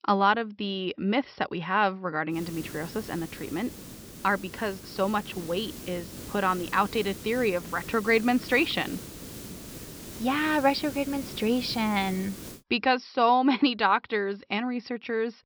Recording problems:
high frequencies cut off; noticeable; nothing above 5.5 kHz
hiss; noticeable; from 2.5 to 13 s; 15 dB below the speech

